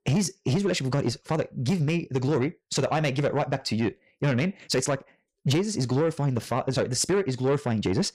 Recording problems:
wrong speed, natural pitch; too fast; 1.5 times normal speed
distortion; slight; 10 dB below the speech

